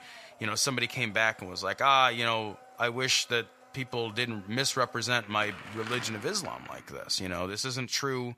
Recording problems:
thin; somewhat; fading below 600 Hz
household noises; noticeable; throughout; 20 dB below the speech

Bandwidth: 14.5 kHz